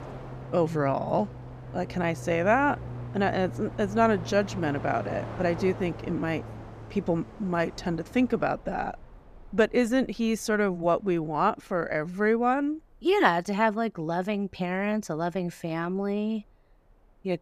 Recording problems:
train or aircraft noise; noticeable; throughout; 15 dB below the speech

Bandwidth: 14.5 kHz